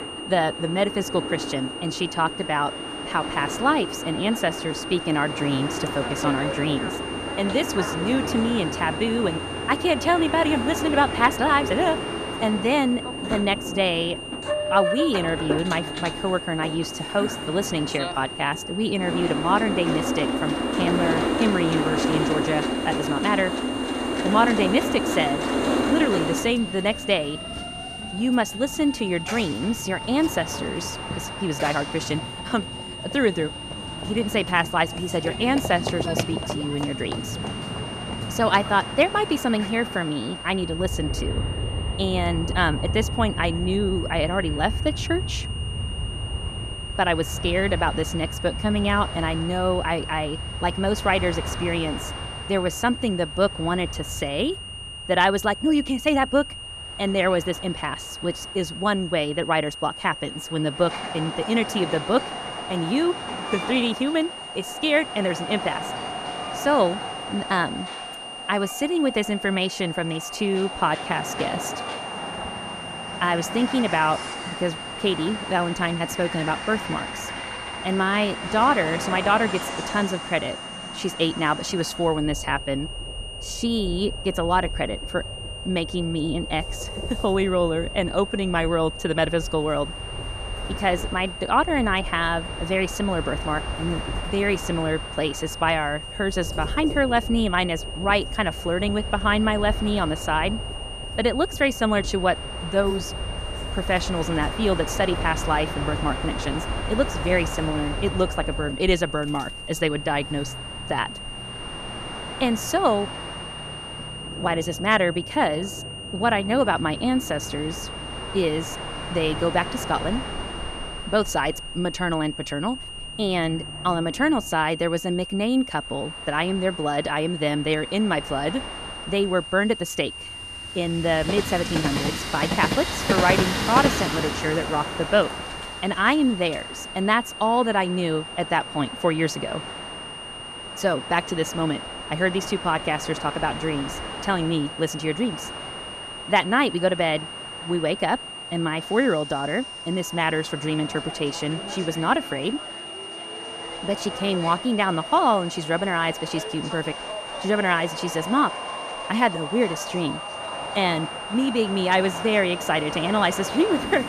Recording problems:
train or aircraft noise; loud; throughout; 7 dB below the speech
high-pitched whine; noticeable; throughout; 3 kHz, 10 dB below the speech

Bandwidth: 14.5 kHz